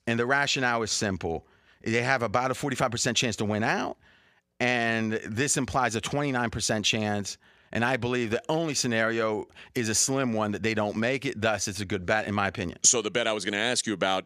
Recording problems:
none

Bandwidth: 15 kHz